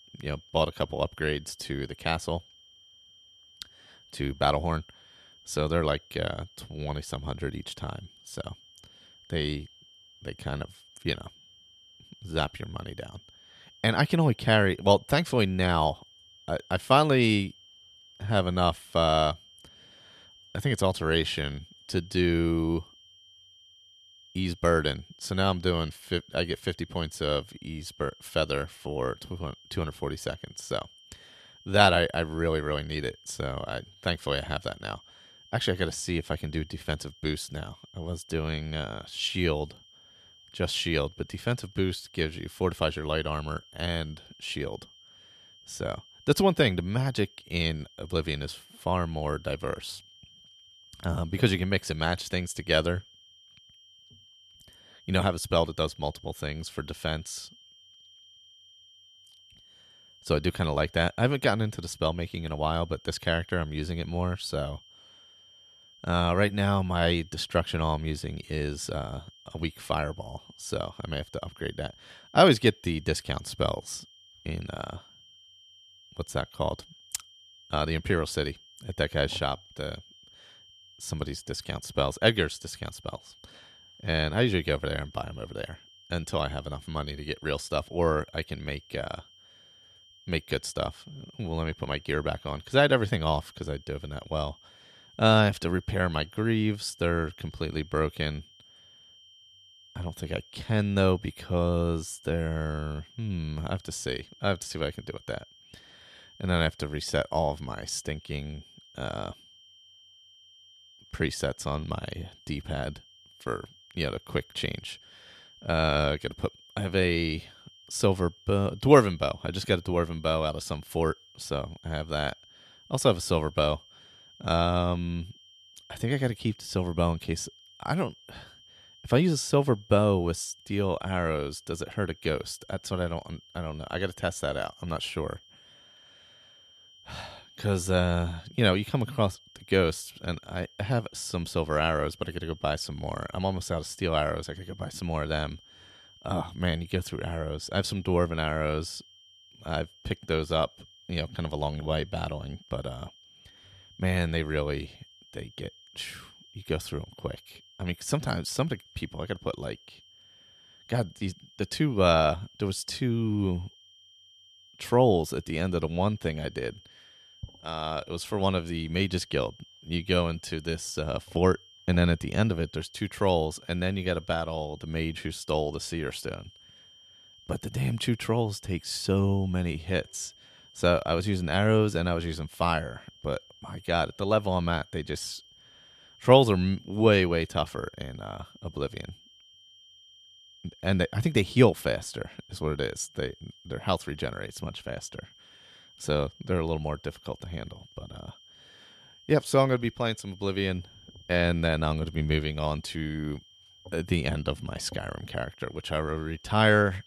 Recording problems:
high-pitched whine; faint; throughout; 3 kHz, 25 dB below the speech

